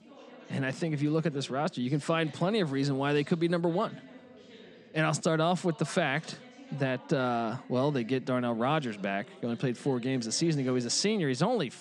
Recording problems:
background chatter; faint; throughout; 3 voices, 20 dB below the speech

